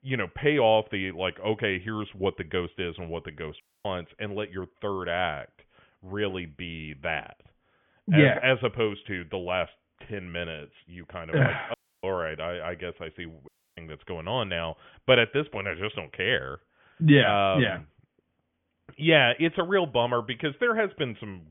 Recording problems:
high frequencies cut off; severe; nothing above 3.5 kHz
audio cutting out; at 3.5 s, at 12 s and at 13 s

